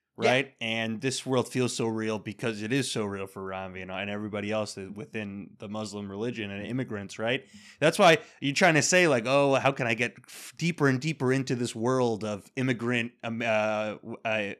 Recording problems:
none

